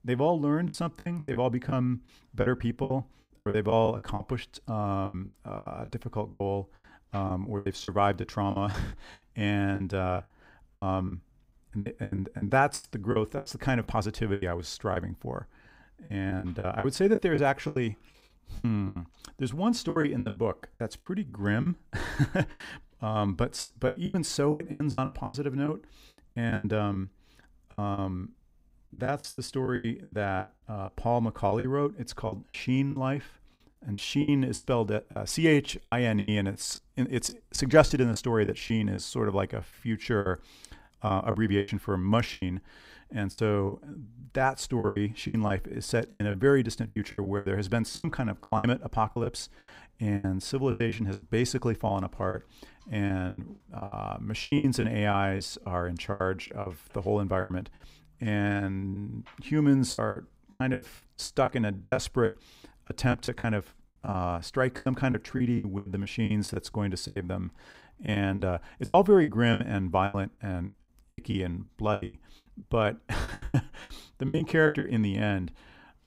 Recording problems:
choppy; very; 15% of the speech affected

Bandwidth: 15.5 kHz